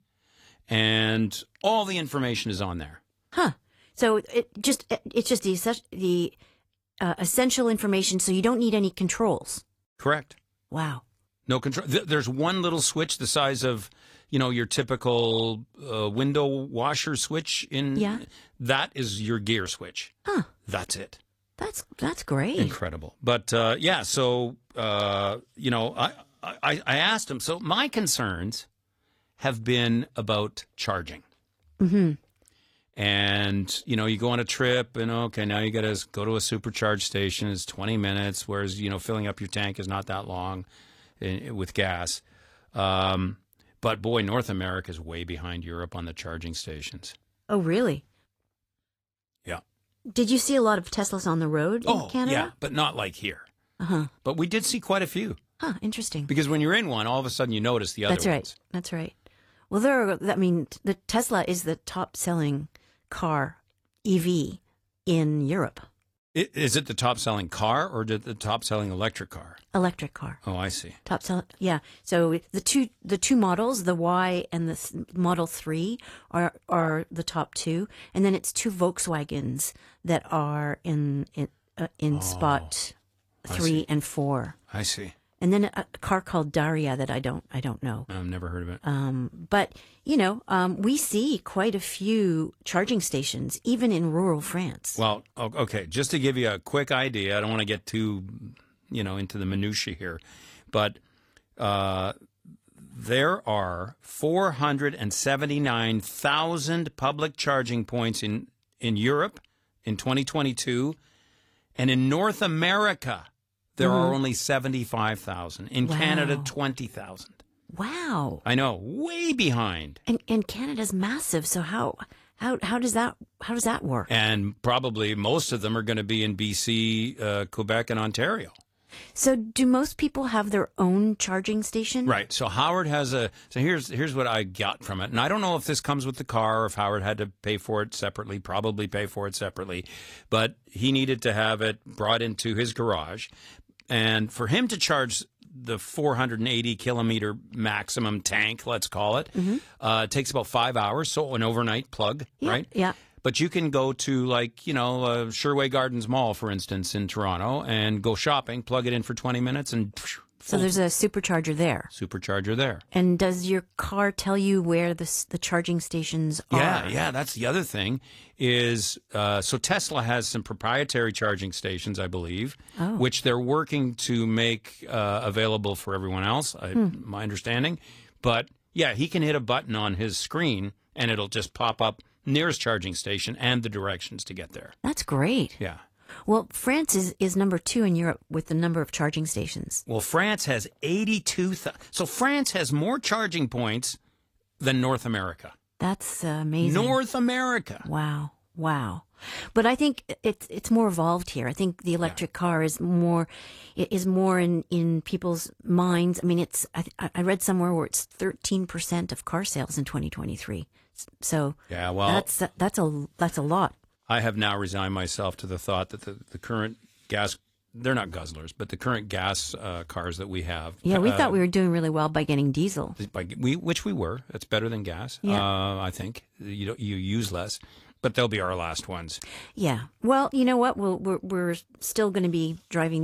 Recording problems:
garbled, watery; slightly
abrupt cut into speech; at the end

